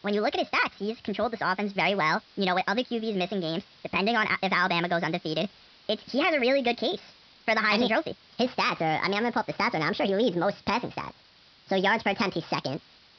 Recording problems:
wrong speed and pitch; too fast and too high; 1.5 times normal speed
high frequencies cut off; noticeable; nothing above 5.5 kHz
hiss; faint; throughout; 25 dB below the speech

